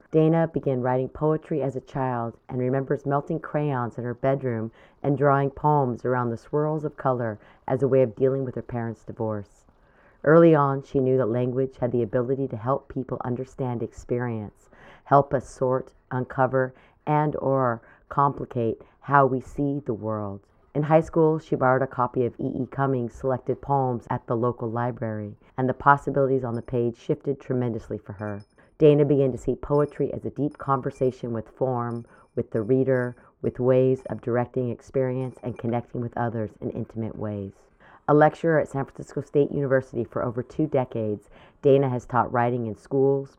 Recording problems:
muffled; very; fading above 1.5 kHz
household noises; very faint; throughout; 40 dB below the speech

